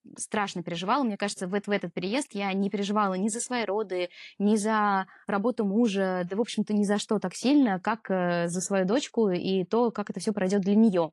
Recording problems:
garbled, watery; slightly

